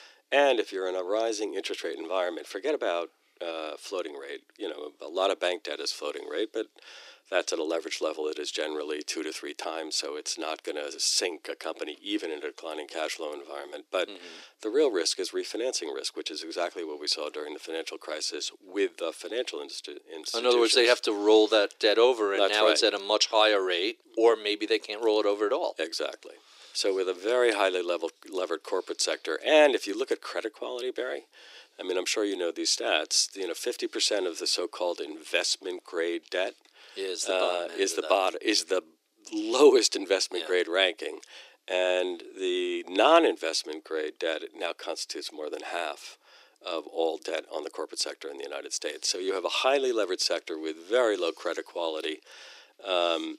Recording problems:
thin; very; fading below 300 Hz

